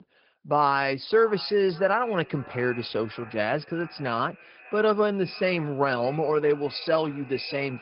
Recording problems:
high frequencies cut off; noticeable; nothing above 5 kHz
echo of what is said; faint; throughout; 590 ms later, 20 dB below the speech
garbled, watery; slightly

